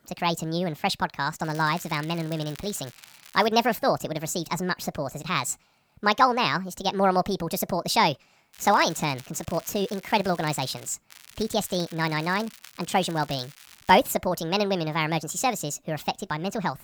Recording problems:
wrong speed and pitch; too fast and too high; 1.5 times normal speed
crackling; faint; from 1.5 to 3.5 s, from 8.5 to 11 s and from 11 to 14 s; 20 dB below the speech

